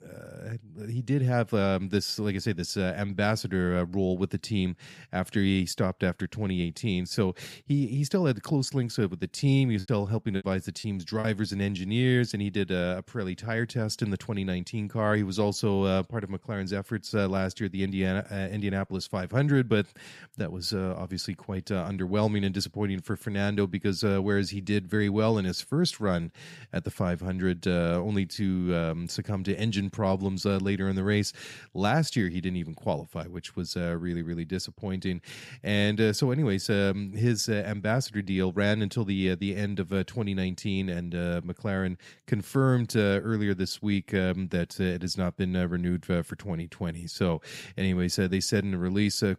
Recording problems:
choppy; very; from 10 to 11 s; 12% of the speech affected

